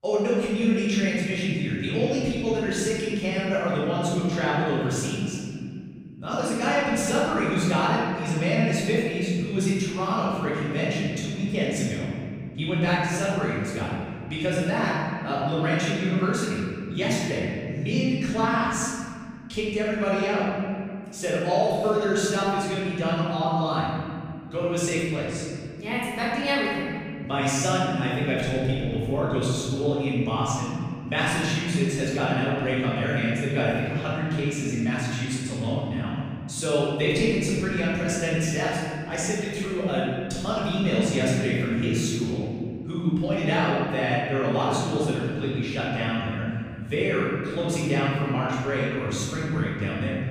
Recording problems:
room echo; strong; dies away in 2.5 s
off-mic speech; far

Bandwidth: 15 kHz